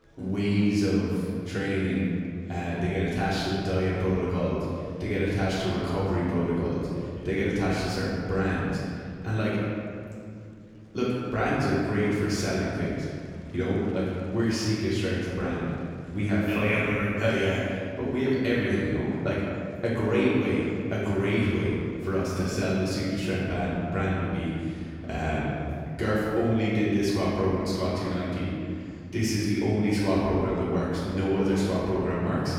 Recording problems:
room echo; strong; dies away in 2.3 s
off-mic speech; far
murmuring crowd; faint; throughout; 30 dB below the speech

